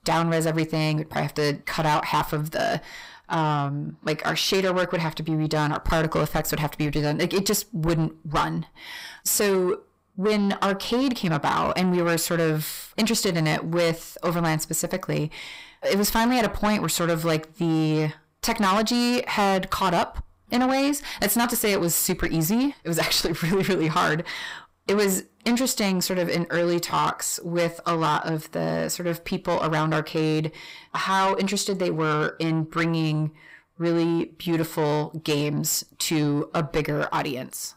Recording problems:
distortion; heavy; 7 dB below the speech

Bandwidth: 15.5 kHz